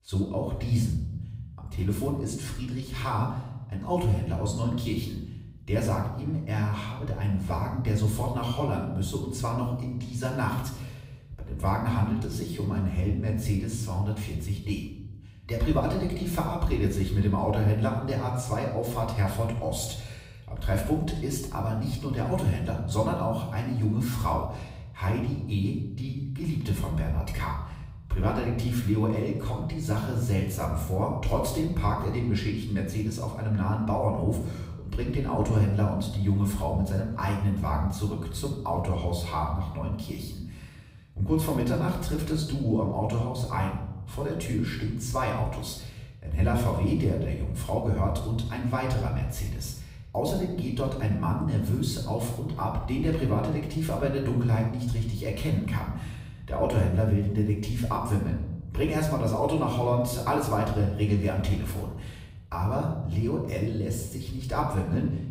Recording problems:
off-mic speech; far
room echo; noticeable; dies away in 1 s

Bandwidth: 15.5 kHz